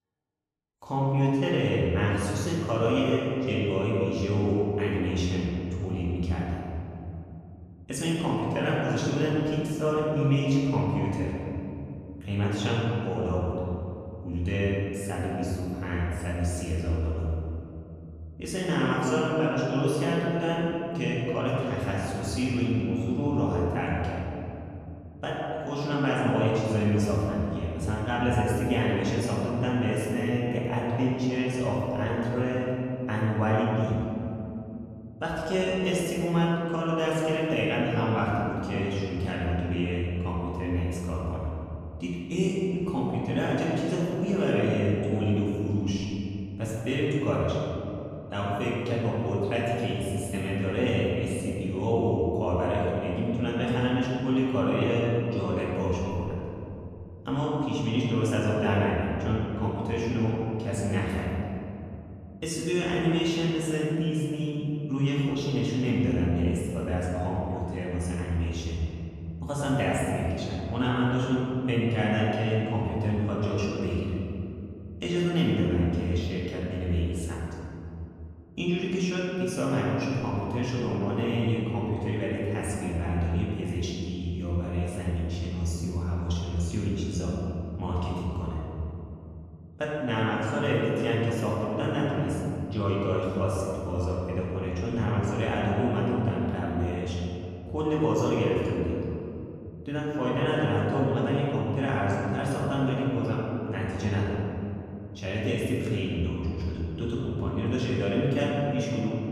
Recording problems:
room echo; strong; dies away in 2.9 s
off-mic speech; far

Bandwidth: 14 kHz